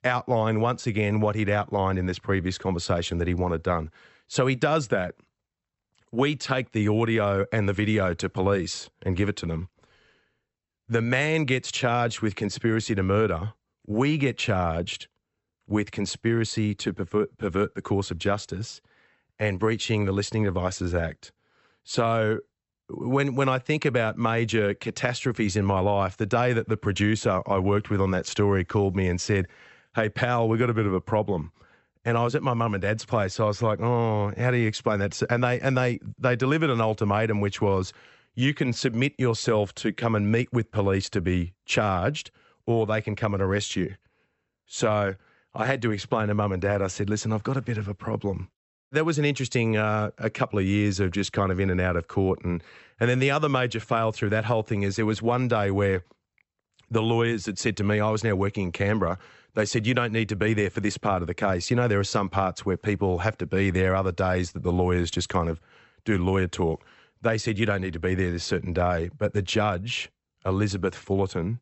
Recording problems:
high frequencies cut off; noticeable; nothing above 8 kHz

